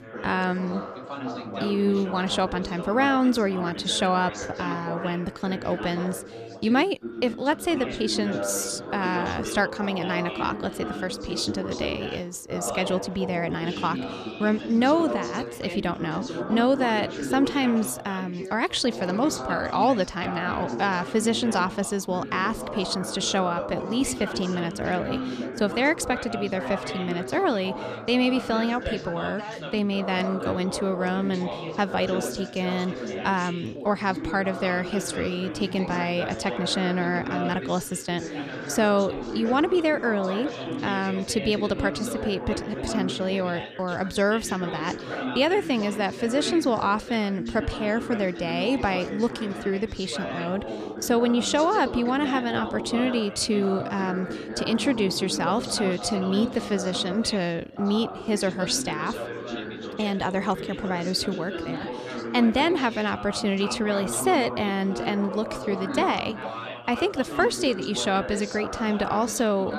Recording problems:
background chatter; loud; throughout; 4 voices, 7 dB below the speech

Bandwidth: 14.5 kHz